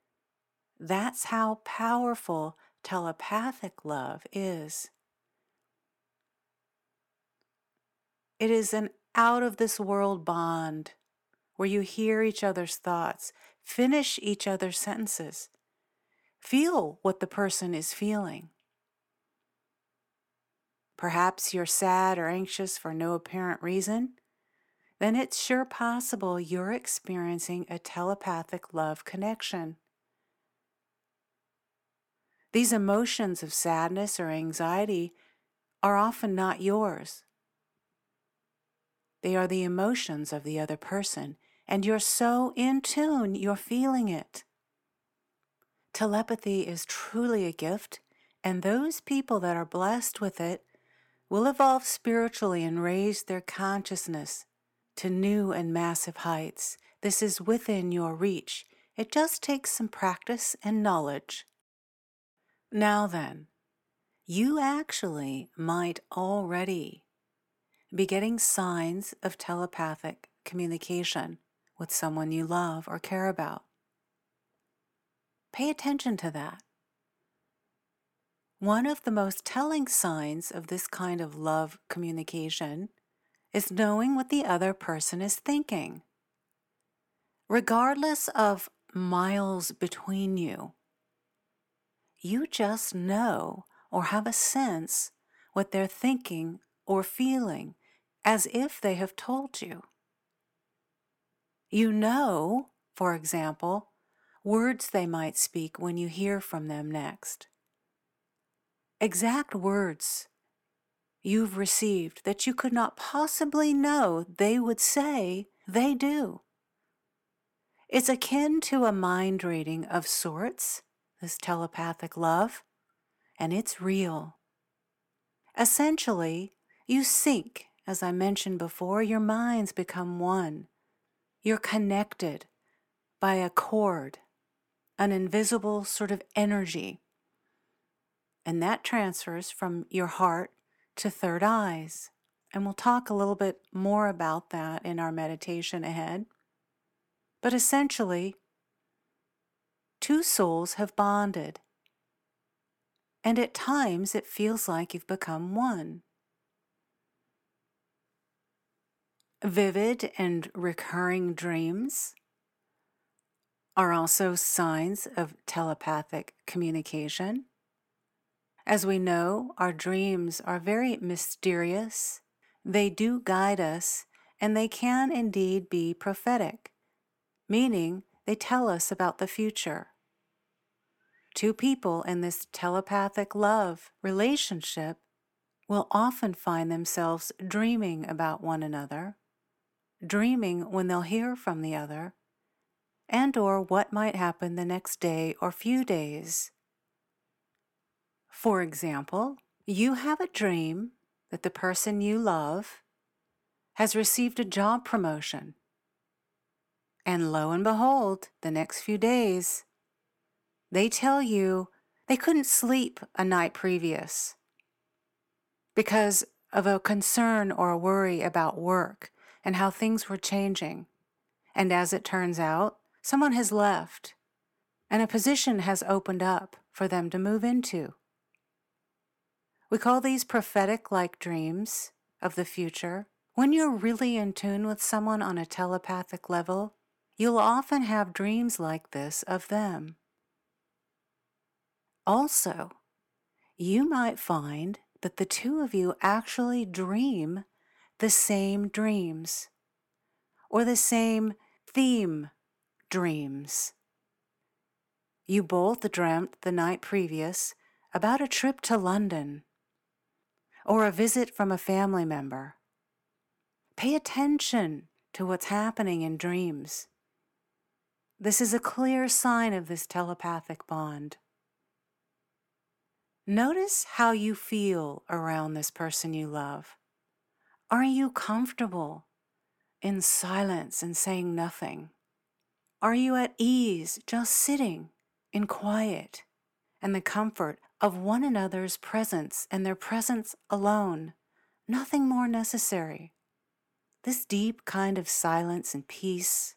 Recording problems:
none

